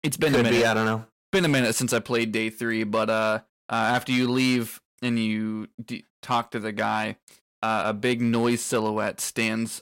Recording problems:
distortion; slight; 5% of the sound clipped

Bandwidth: 16 kHz